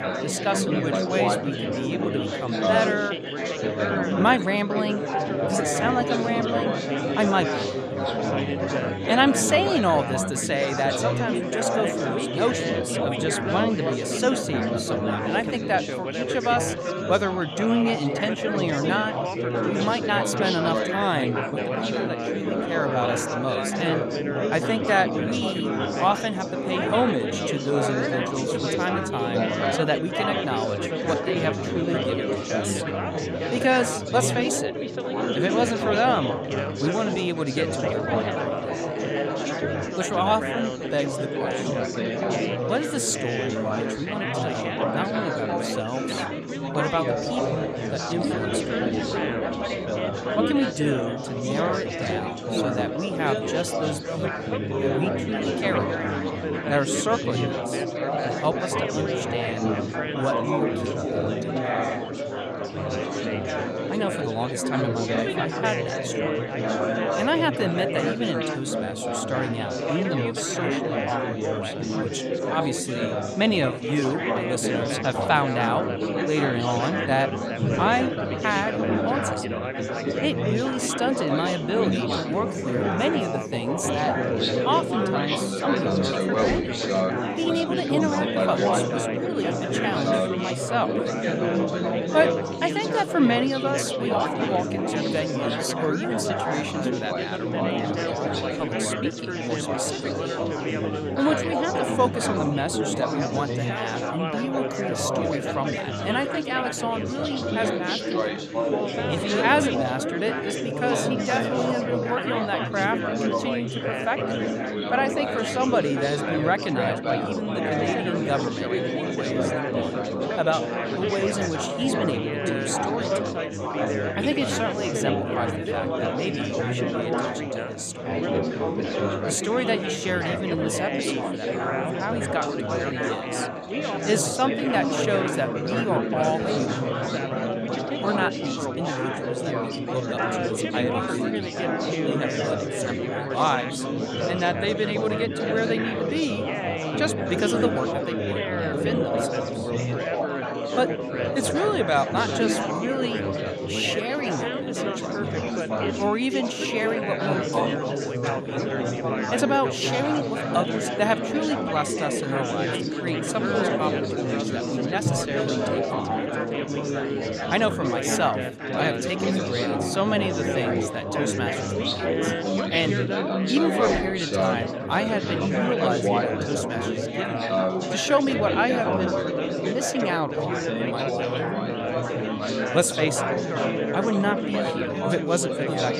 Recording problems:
chatter from many people; very loud; throughout; 1 dB above the speech

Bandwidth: 15.5 kHz